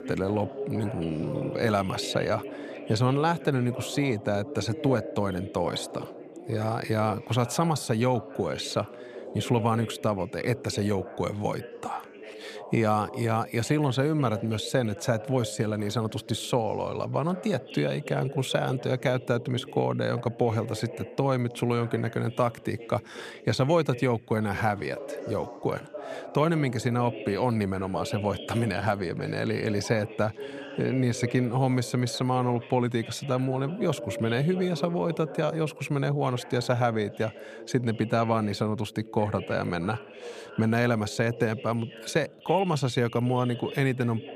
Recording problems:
background chatter; noticeable; throughout; 2 voices, 15 dB below the speech

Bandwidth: 14.5 kHz